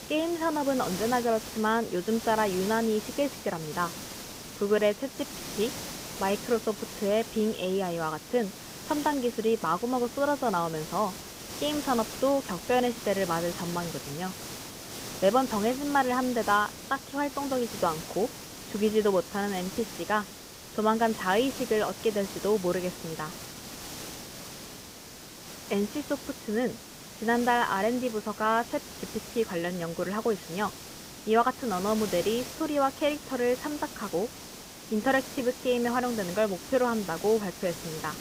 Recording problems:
high frequencies cut off; severe; nothing above 4 kHz
hiss; noticeable; throughout; 10 dB below the speech

